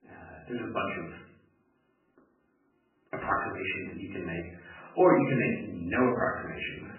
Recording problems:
off-mic speech; far
garbled, watery; badly; nothing above 2.5 kHz
room echo; slight; dies away in 0.5 s

